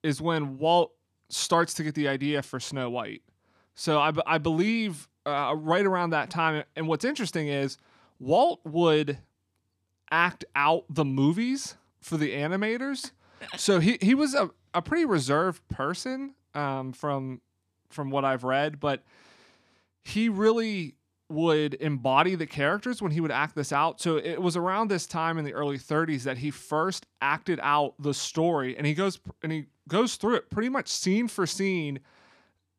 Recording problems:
none

